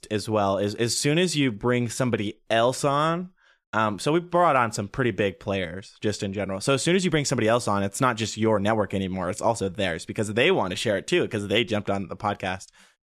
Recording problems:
none

